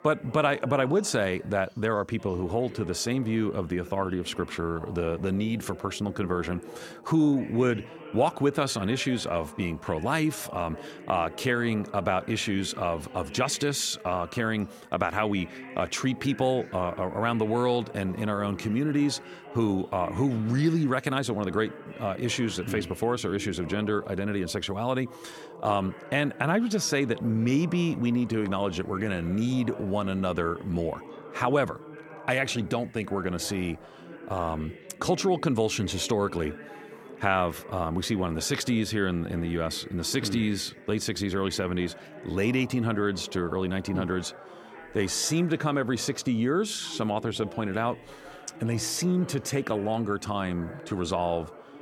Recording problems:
background chatter; noticeable; throughout; 2 voices, 15 dB below the speech

